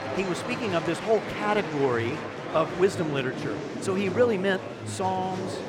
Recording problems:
murmuring crowd; loud; throughout; 6 dB below the speech

